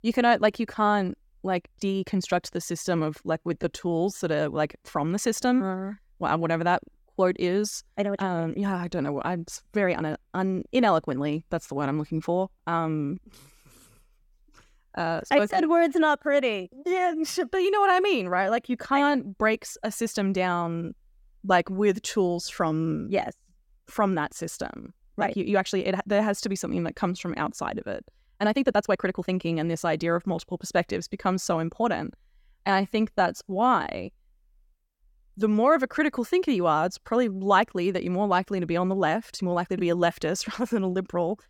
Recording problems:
uneven, jittery; strongly; from 1.5 to 40 s

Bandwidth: 17 kHz